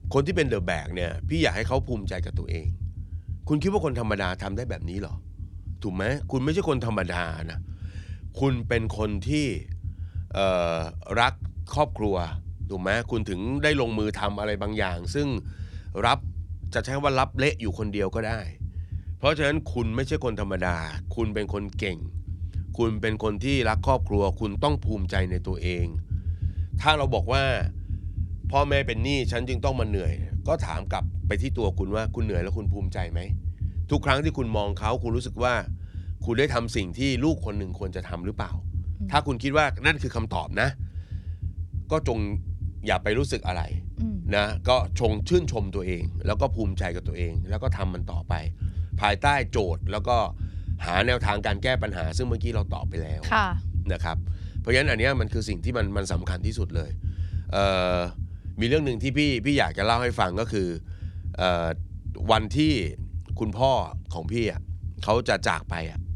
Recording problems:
low rumble; faint; throughout; 20 dB below the speech

